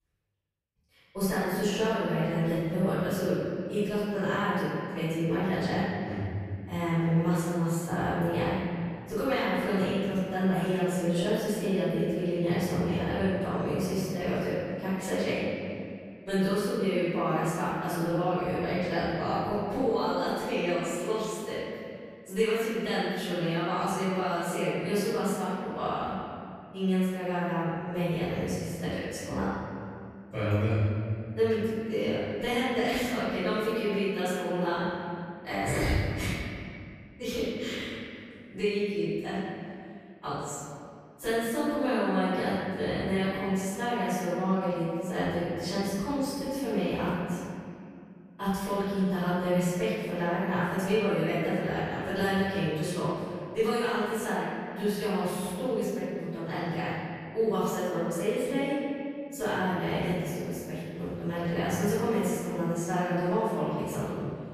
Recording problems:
room echo; strong; dies away in 2.3 s
off-mic speech; far

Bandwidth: 14.5 kHz